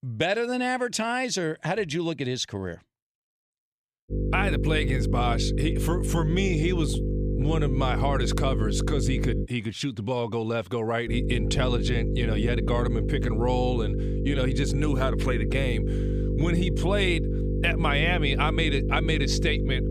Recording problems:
electrical hum; loud; from 4 to 9.5 s and from 11 s on; 50 Hz, 7 dB below the speech

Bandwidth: 14.5 kHz